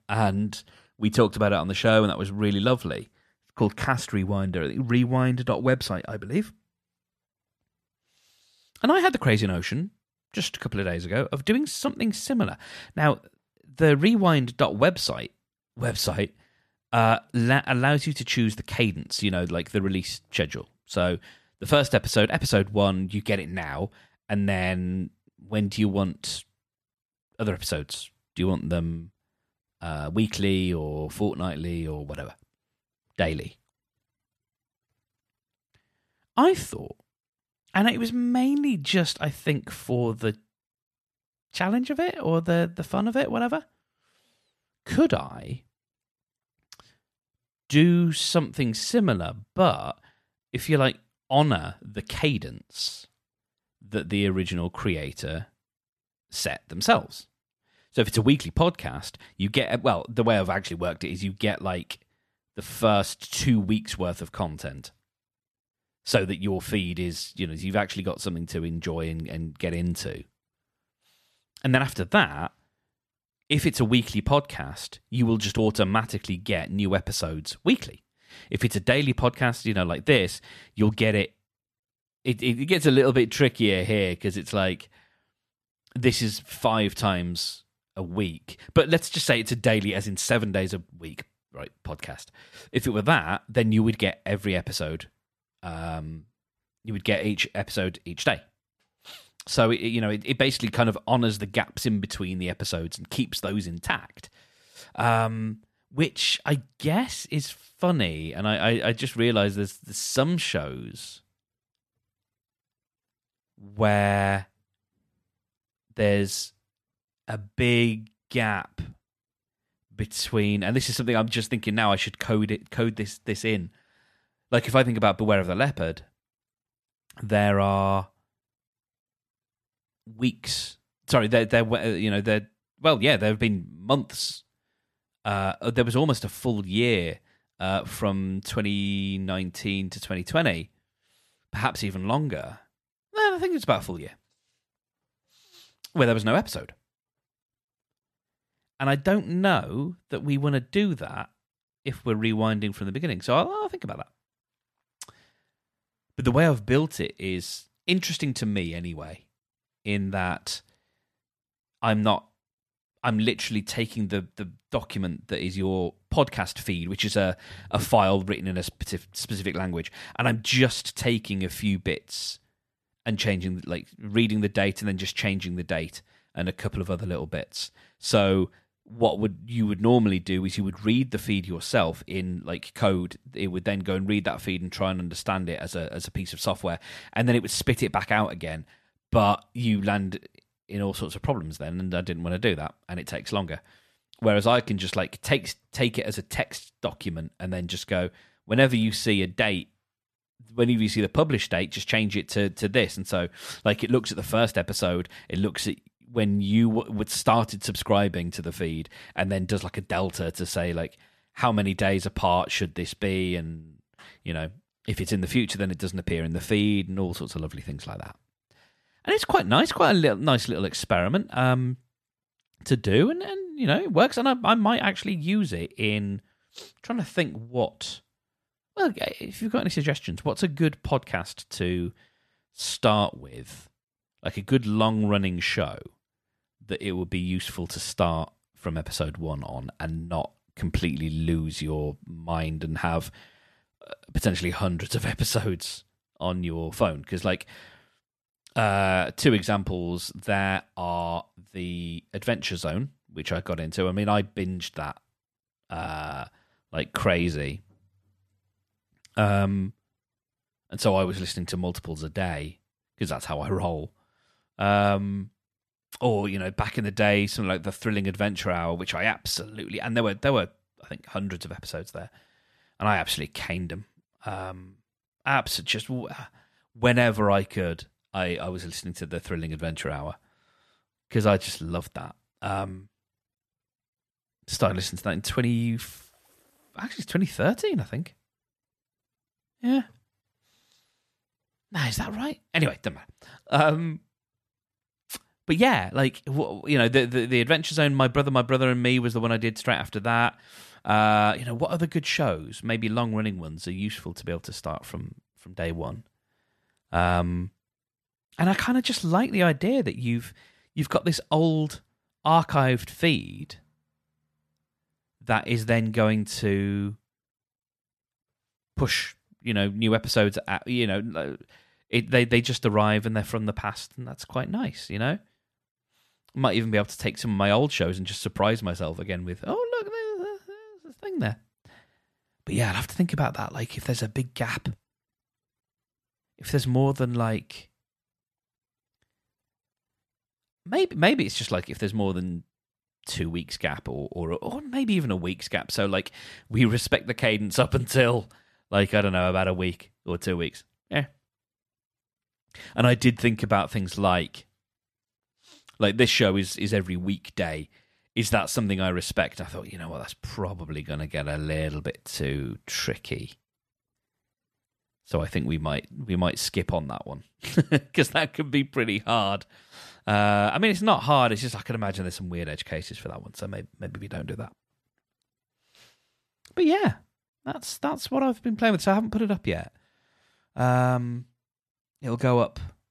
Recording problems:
none

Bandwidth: 14 kHz